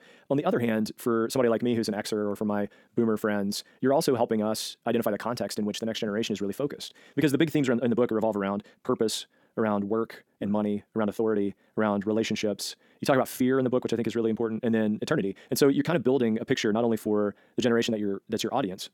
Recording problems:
wrong speed, natural pitch; too fast; 1.8 times normal speed

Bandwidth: 17 kHz